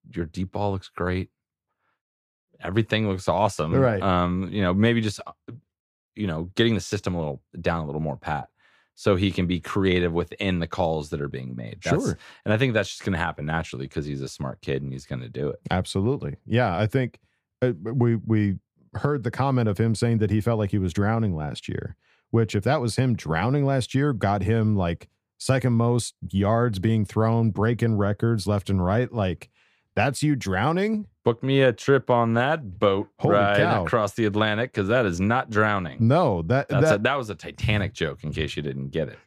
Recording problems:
none

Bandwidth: 15 kHz